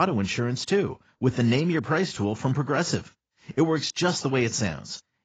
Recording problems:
garbled, watery; badly; nothing above 7.5 kHz
abrupt cut into speech; at the start

